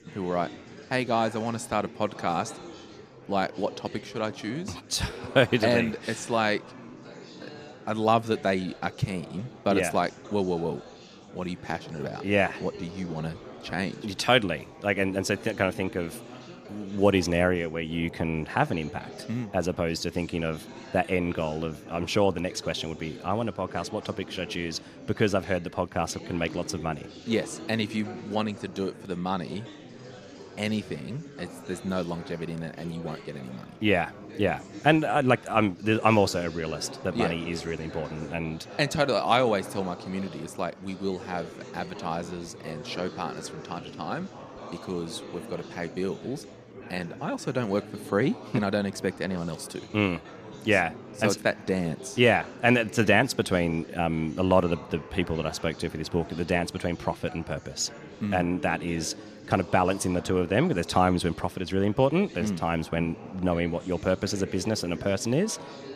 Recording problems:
chatter from many people; noticeable; throughout; 15 dB below the speech

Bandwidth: 14.5 kHz